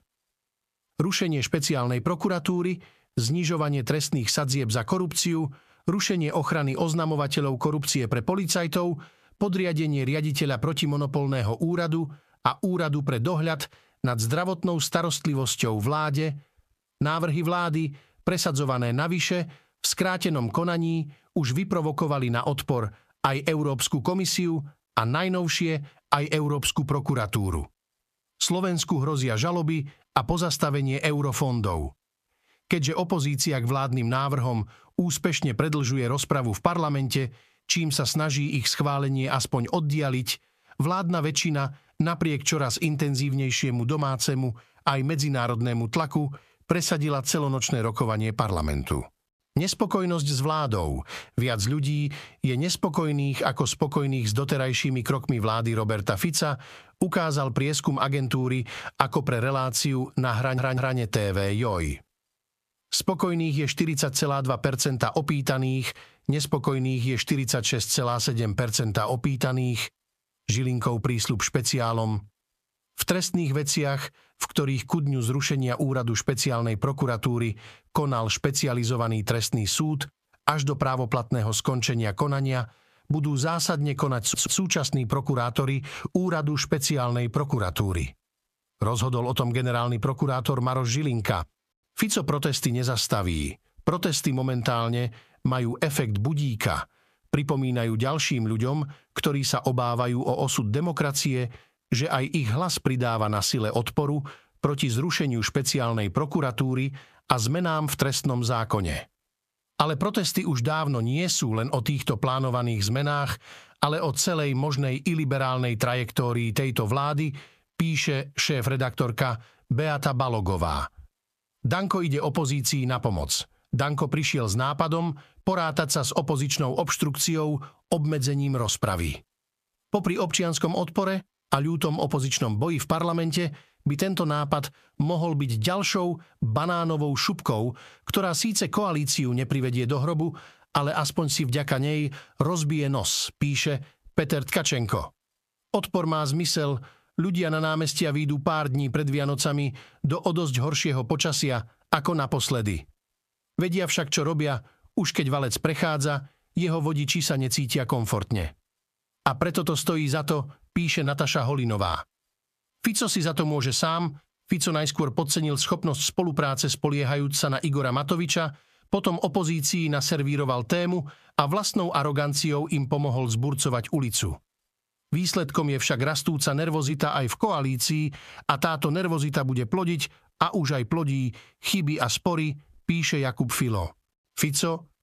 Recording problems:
squashed, flat; somewhat
audio stuttering; at 1:00 and at 1:24

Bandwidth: 14.5 kHz